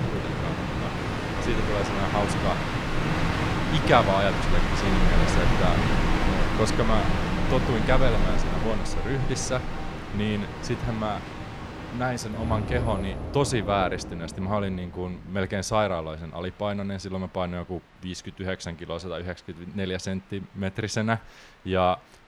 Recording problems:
train or aircraft noise; very loud; throughout; as loud as the speech

